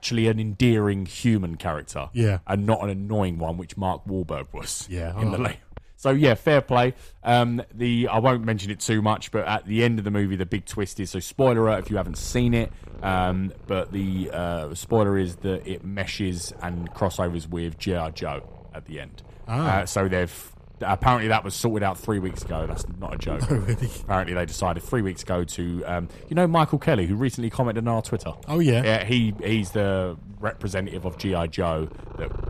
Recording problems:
animal sounds; noticeable; throughout; 20 dB below the speech

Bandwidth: 14.5 kHz